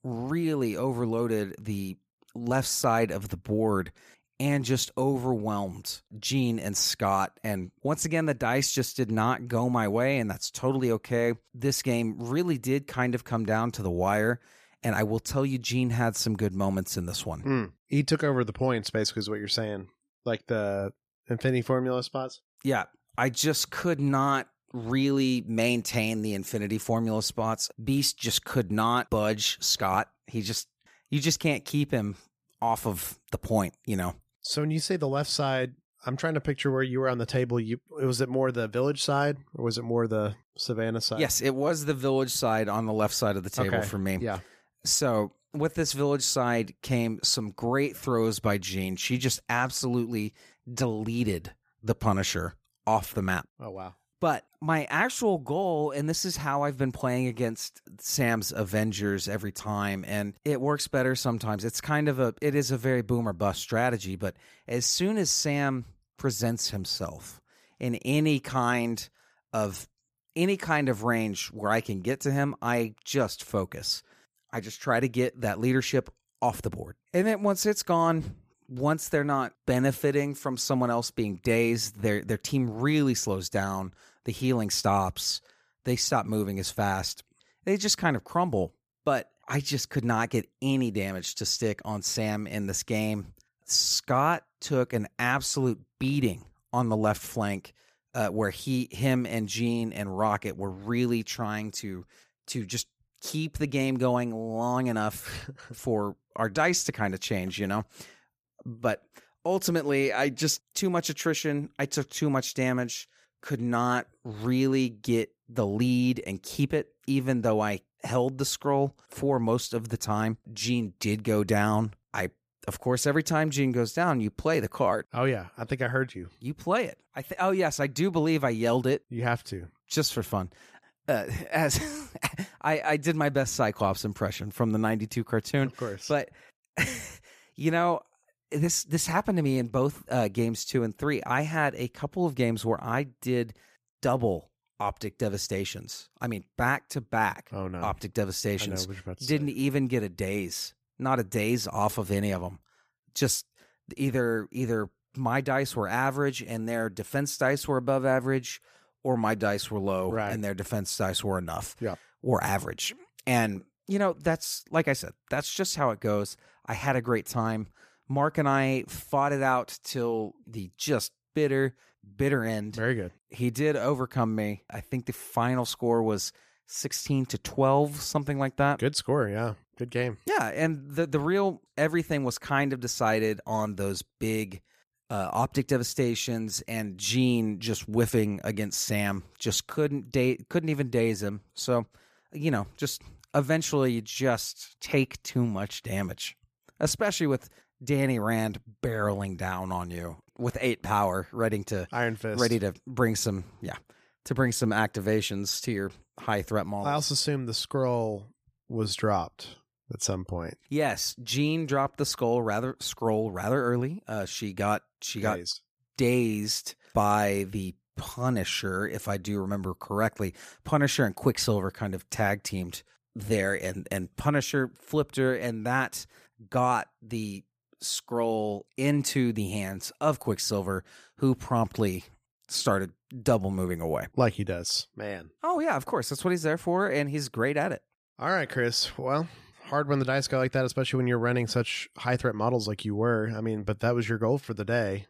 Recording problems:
none

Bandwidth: 14.5 kHz